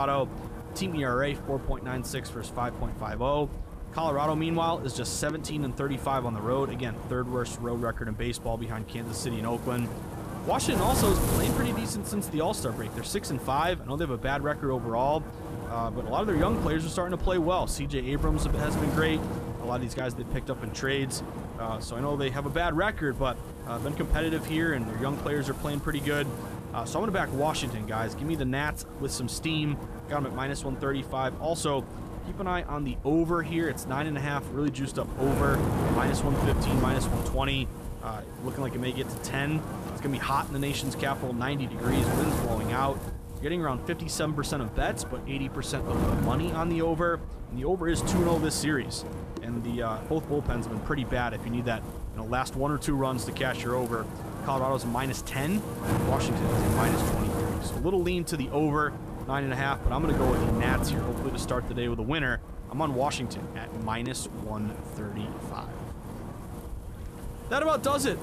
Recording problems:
wind noise on the microphone; heavy; 7 dB below the speech
abrupt cut into speech; at the start

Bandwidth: 14.5 kHz